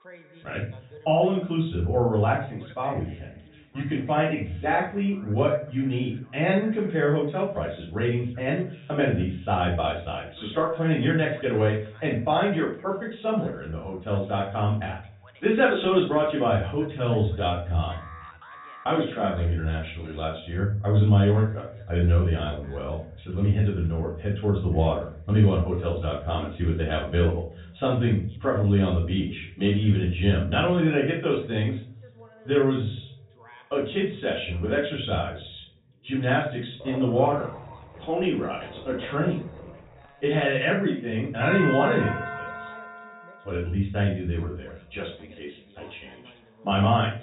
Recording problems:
off-mic speech; far
high frequencies cut off; severe; nothing above 4 kHz
room echo; slight; dies away in 0.5 s
voice in the background; faint; throughout; 25 dB below the speech
alarm; faint; at 18 s; peak 20 dB below the speech
dog barking; faint; from 37 to 40 s; peak 10 dB below the speech
doorbell; noticeable; from 41 to 43 s; peak 3 dB below the speech

